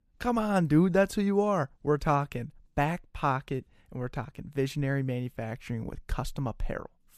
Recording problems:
none

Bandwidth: 14.5 kHz